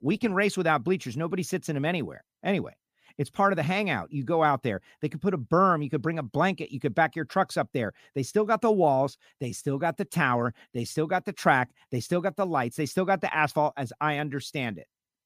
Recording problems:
none

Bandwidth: 15 kHz